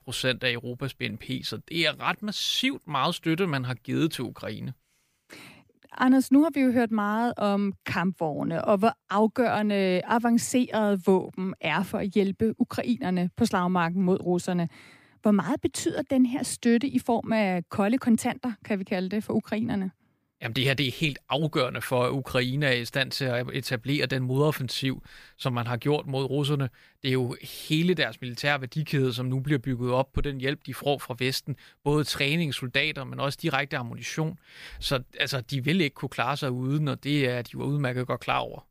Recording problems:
none

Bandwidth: 15 kHz